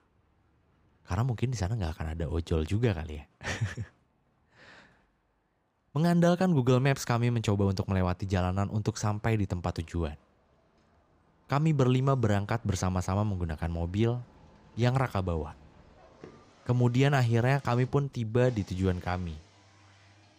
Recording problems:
traffic noise; faint; throughout; 30 dB below the speech

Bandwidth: 15 kHz